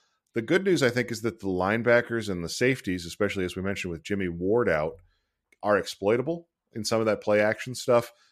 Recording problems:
none

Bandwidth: 14.5 kHz